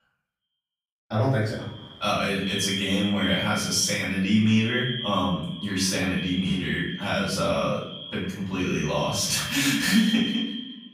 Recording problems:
echo of what is said; strong; throughout; 130 ms later, 9 dB below the speech
off-mic speech; far
room echo; noticeable; dies away in 0.7 s

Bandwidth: 15.5 kHz